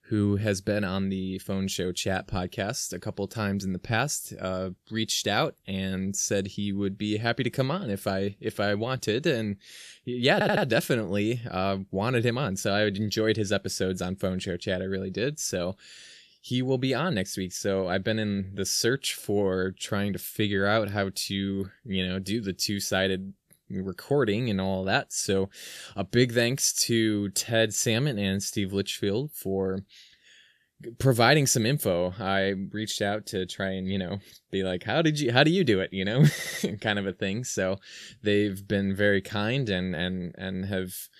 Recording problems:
audio stuttering; at 10 s and at 36 s

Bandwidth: 14.5 kHz